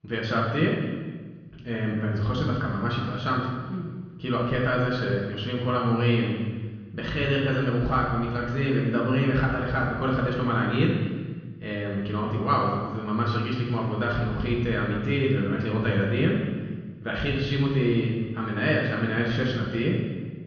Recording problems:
off-mic speech; far
room echo; noticeable; dies away in 1.3 s
muffled; very slightly; fading above 4 kHz
high frequencies cut off; slight; nothing above 7 kHz

